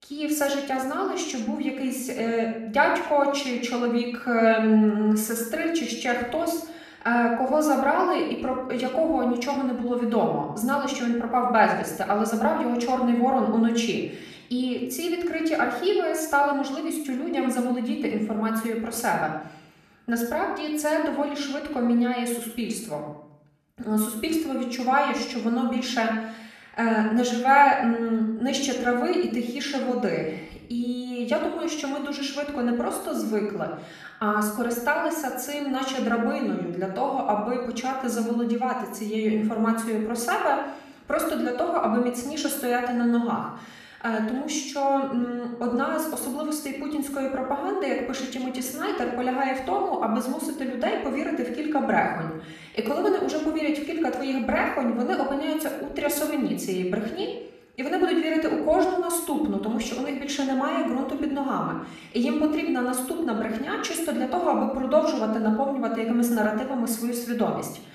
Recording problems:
off-mic speech; far
room echo; noticeable; dies away in 0.6 s

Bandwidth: 14 kHz